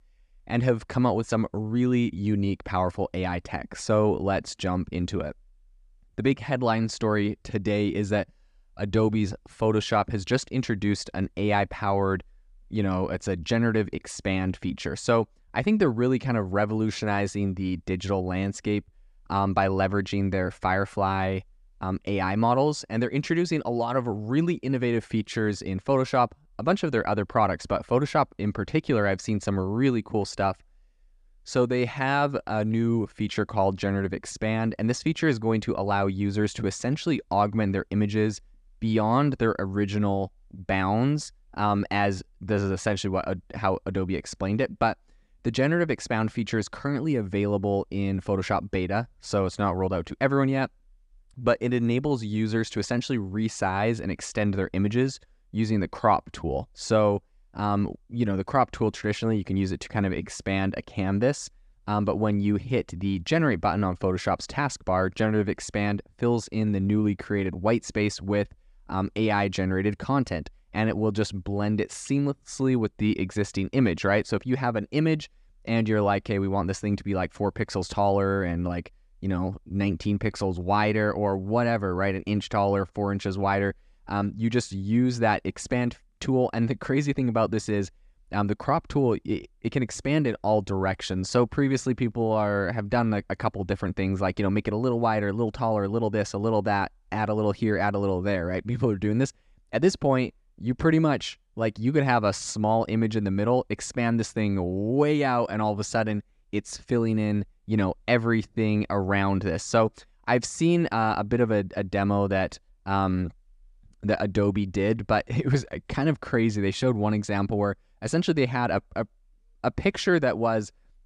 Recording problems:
none

